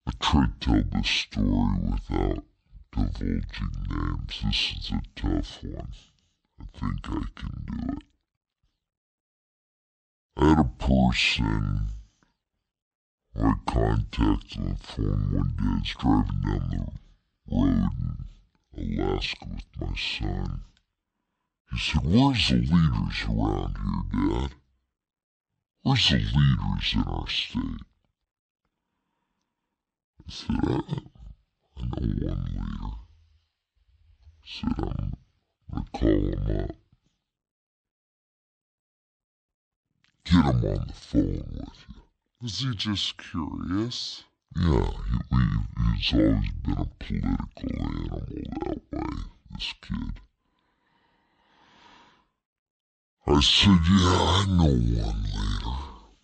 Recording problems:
wrong speed and pitch; too slow and too low; 0.6 times normal speed

